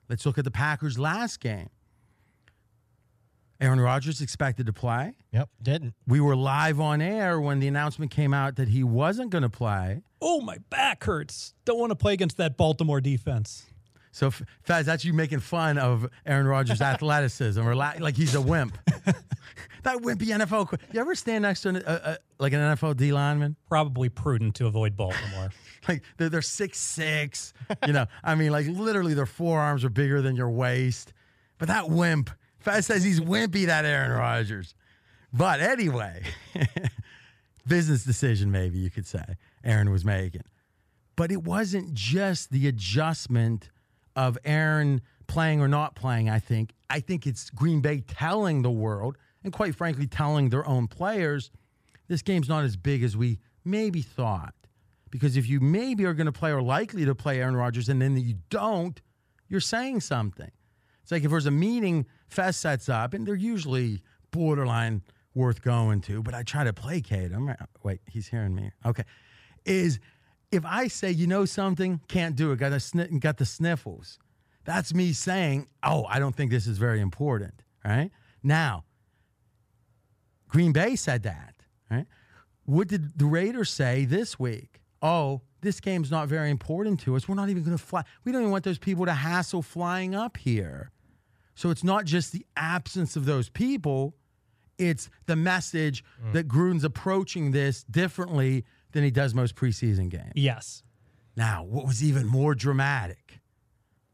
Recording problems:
none

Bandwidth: 14.5 kHz